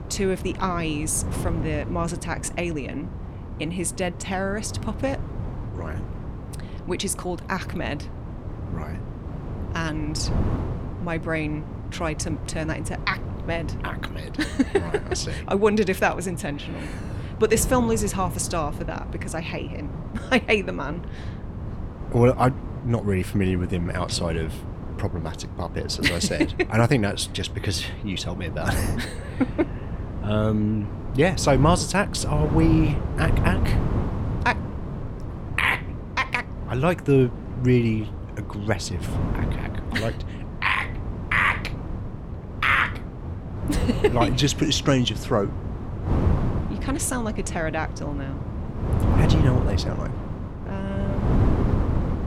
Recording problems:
wind noise on the microphone; occasional gusts; 10 dB below the speech

